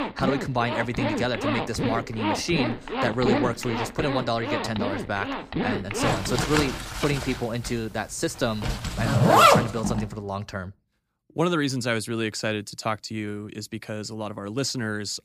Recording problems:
household noises; very loud; until 9.5 s; 3 dB above the speech

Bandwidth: 15 kHz